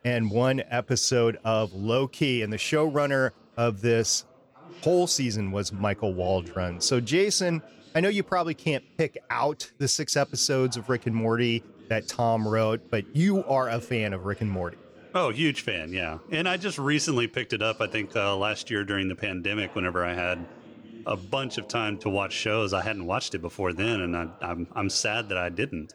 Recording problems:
chatter from many people; faint; throughout; 25 dB below the speech

